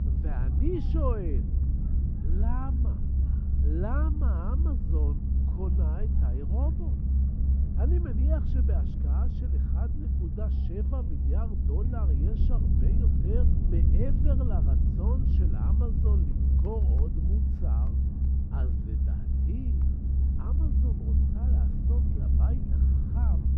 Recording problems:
muffled; very; fading above 3.5 kHz
low rumble; loud; throughout; 1 dB below the speech
household noises; faint; from 12 s on; 25 dB below the speech
chatter from many people; faint; throughout; 25 dB below the speech

